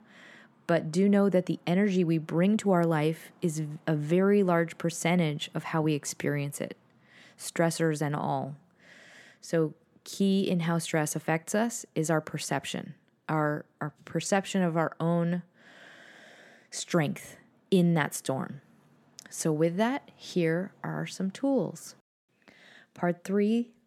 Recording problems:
none

